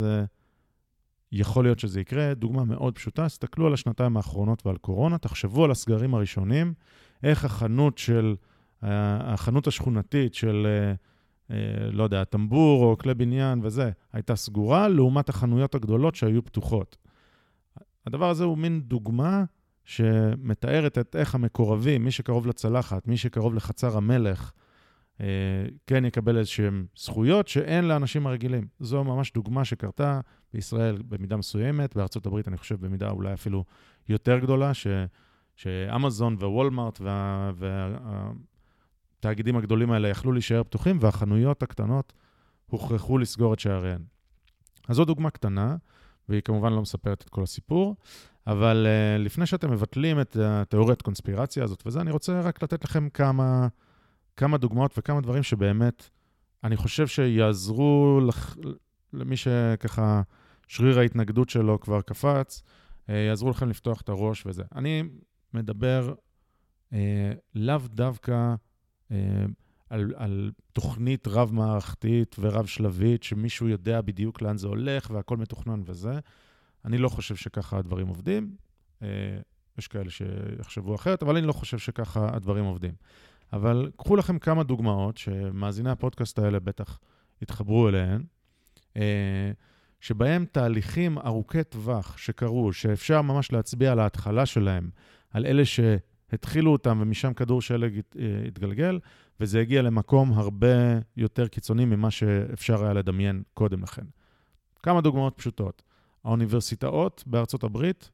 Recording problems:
abrupt cut into speech; at the start

